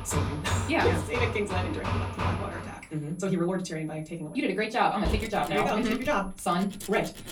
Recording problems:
off-mic speech; far
wrong speed, natural pitch; too fast; 1.5 times normal speed
room echo; very slight; dies away in 0.3 s
machinery noise; loud; throughout; 4 dB below the speech
high-pitched whine; faint; throughout; 11 kHz, 30 dB below the speech

